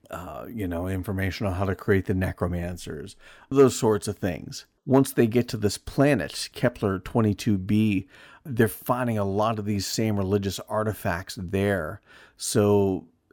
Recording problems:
none

